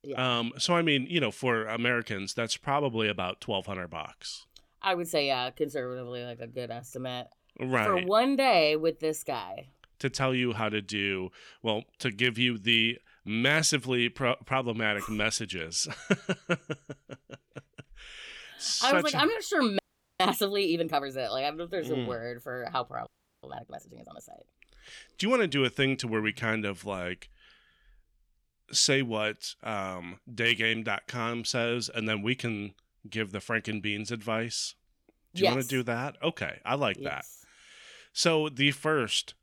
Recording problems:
audio freezing; at 20 s and at 23 s

